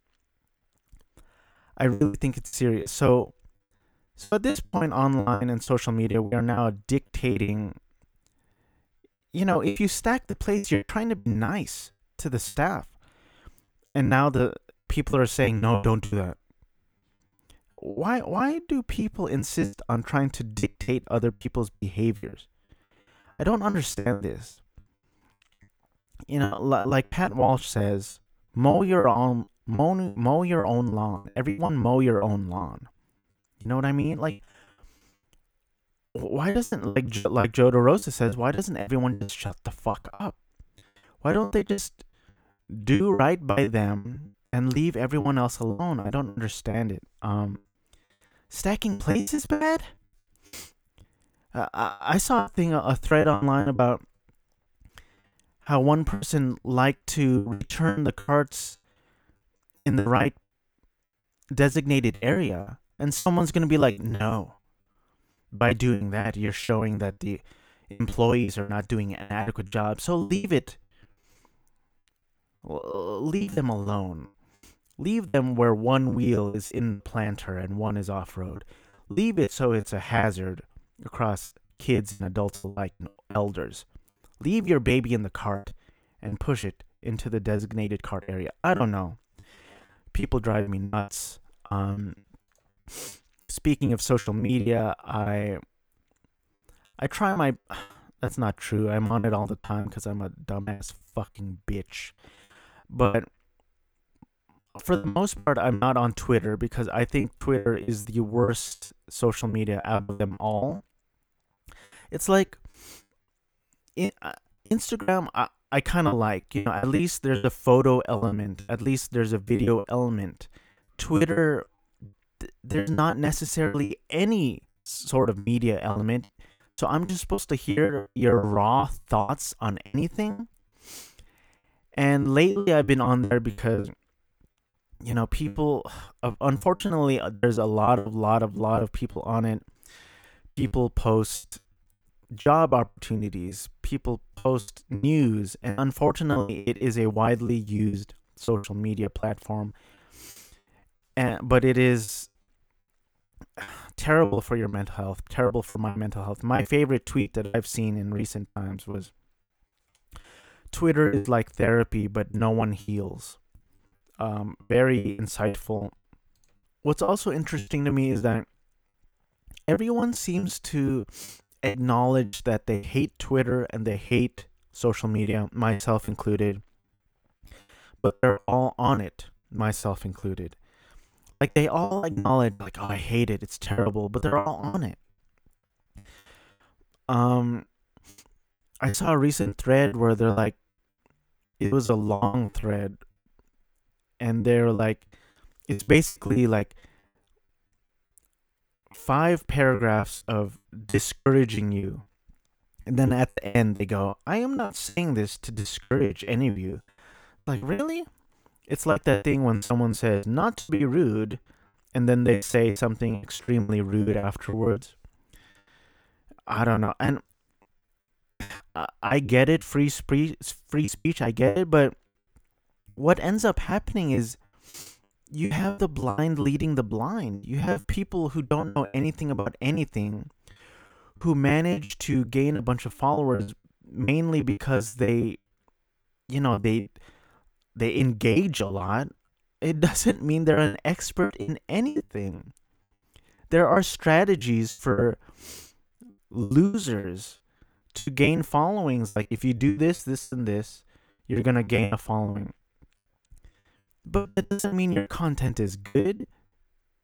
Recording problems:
choppy; very; 16% of the speech affected

